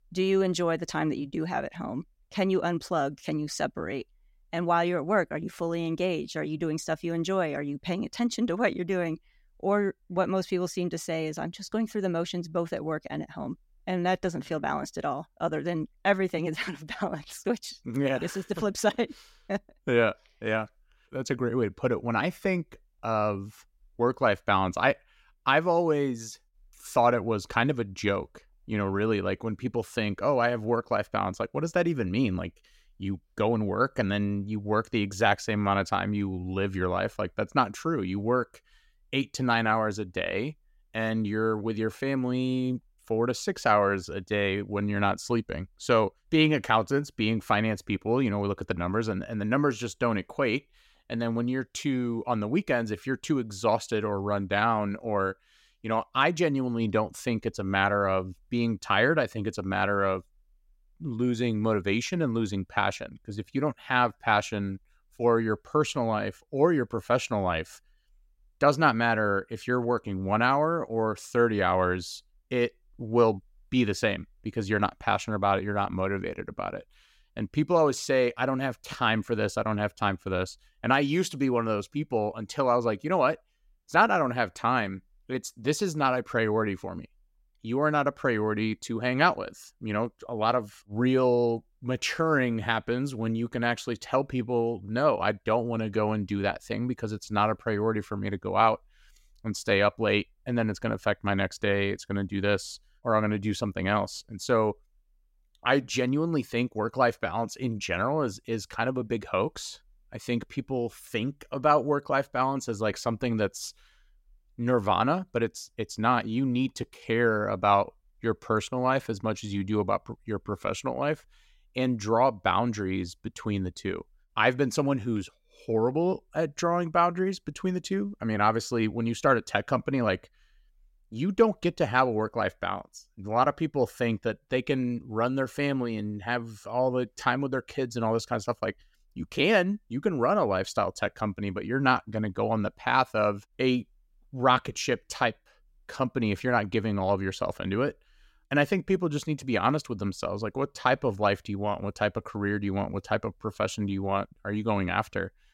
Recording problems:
none

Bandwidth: 16 kHz